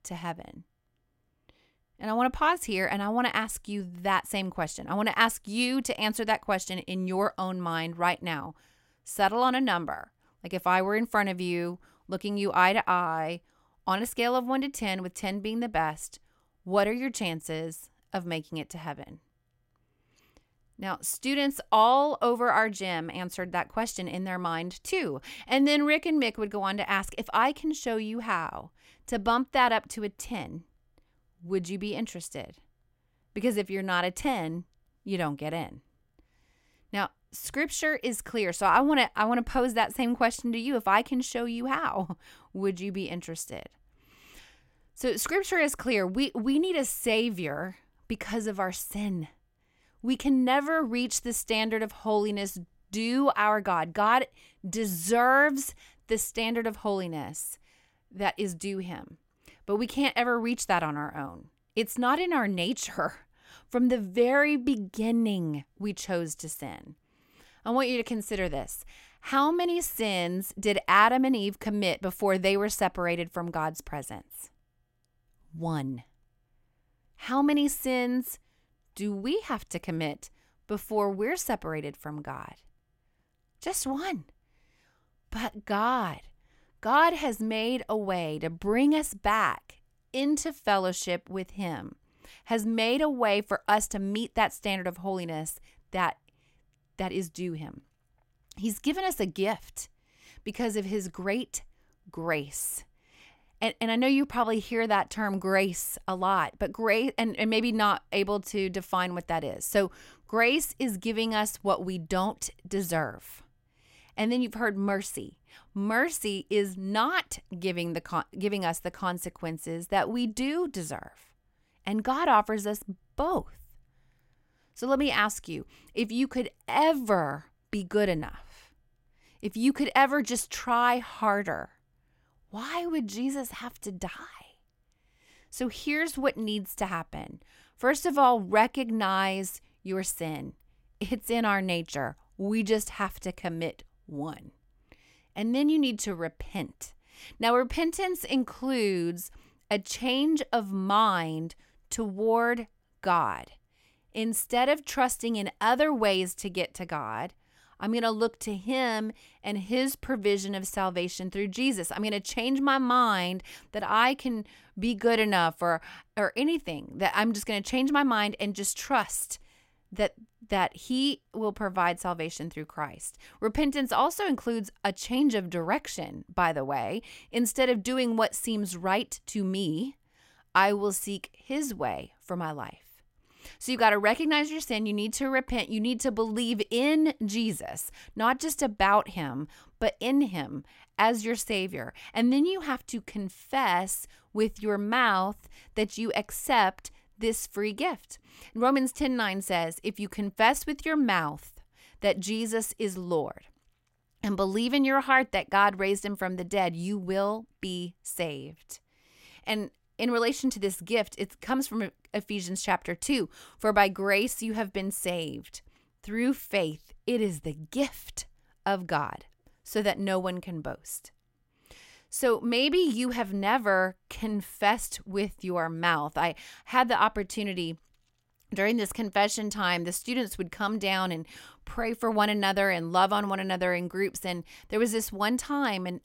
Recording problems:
none

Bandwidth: 16 kHz